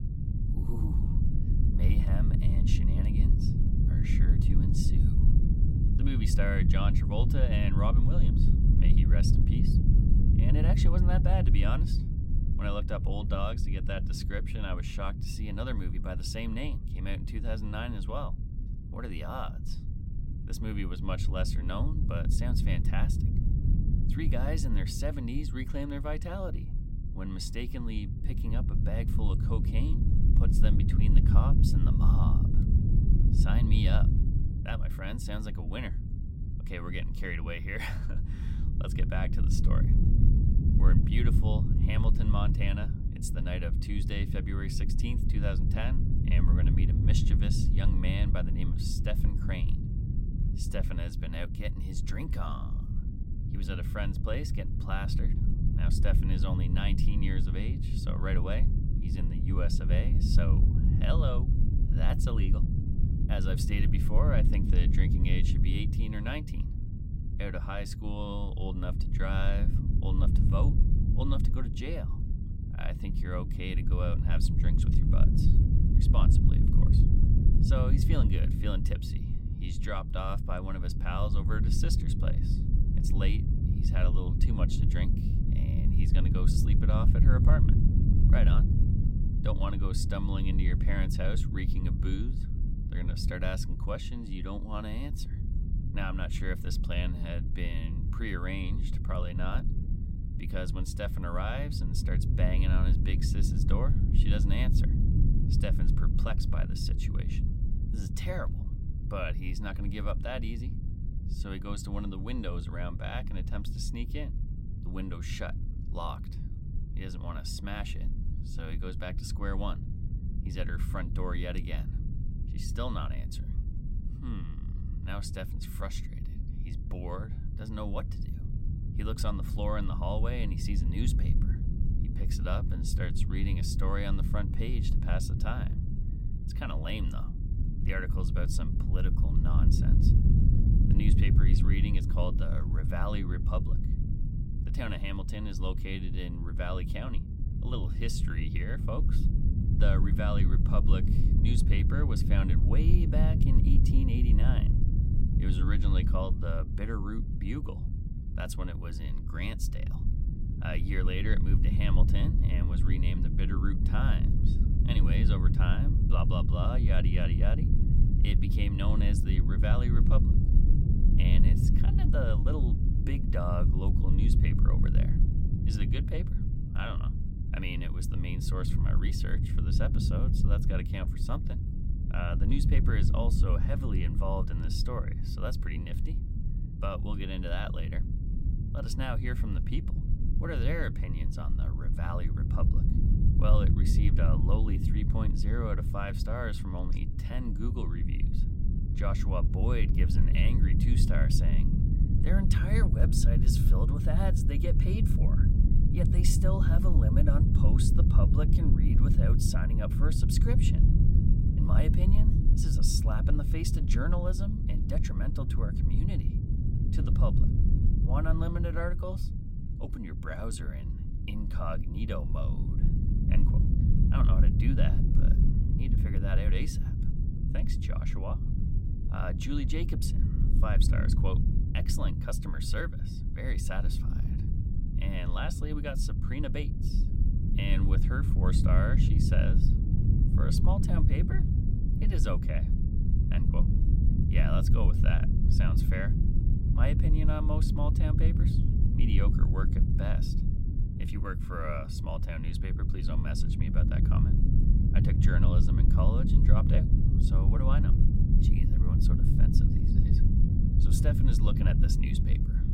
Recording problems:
low rumble; loud; throughout; 3 dB below the speech

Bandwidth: 16 kHz